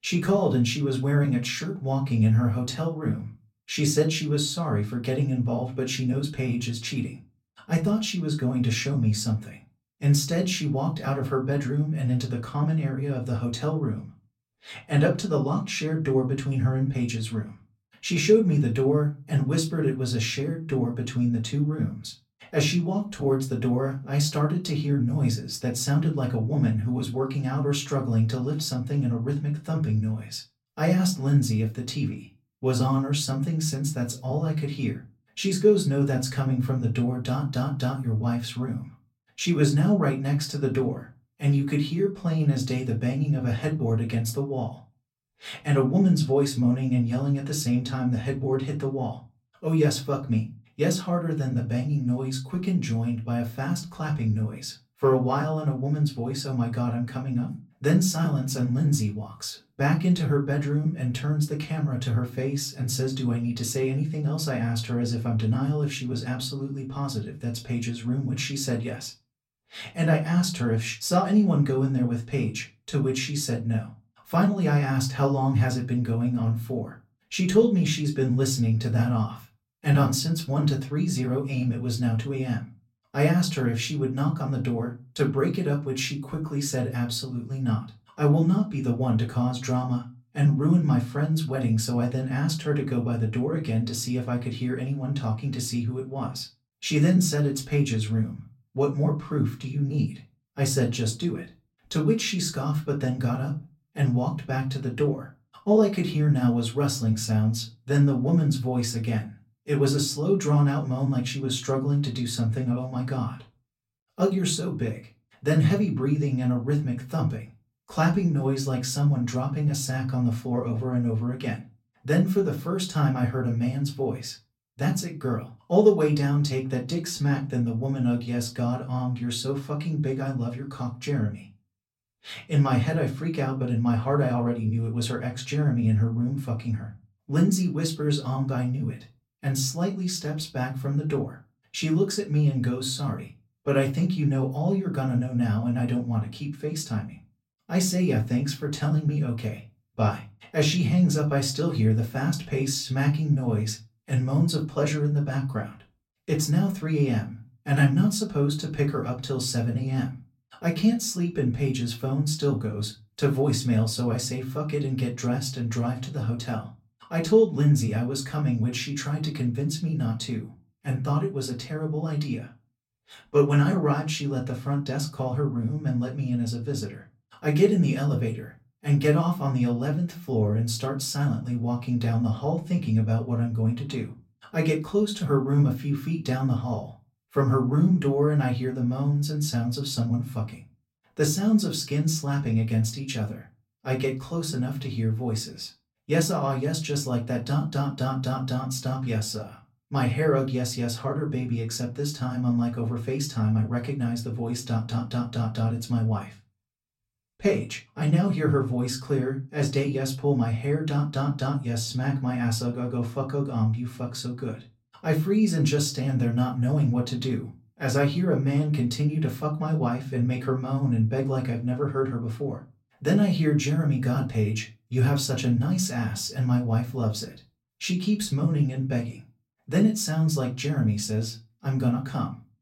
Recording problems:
off-mic speech; far
room echo; very slight; dies away in 0.2 s

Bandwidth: 16 kHz